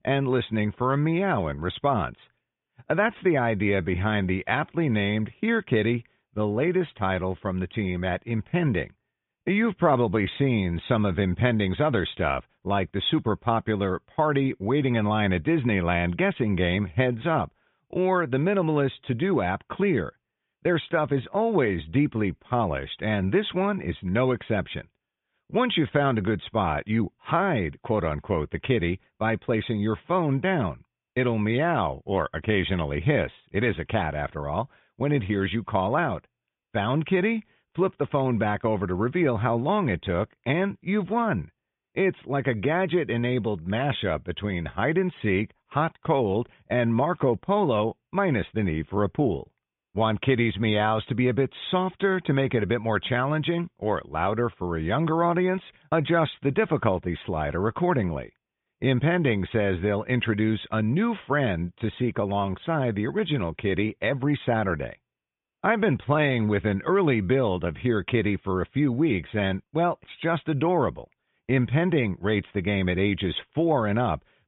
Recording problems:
high frequencies cut off; severe; nothing above 3.5 kHz

